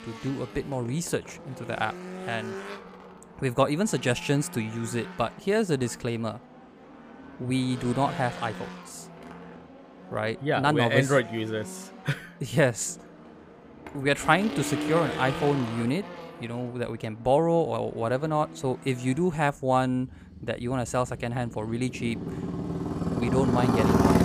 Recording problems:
traffic noise; loud; throughout; 7 dB below the speech

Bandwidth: 15 kHz